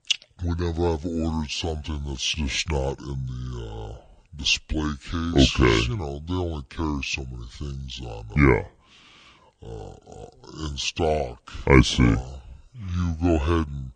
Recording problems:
wrong speed and pitch; too slow and too low; 0.6 times normal speed

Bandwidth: 9 kHz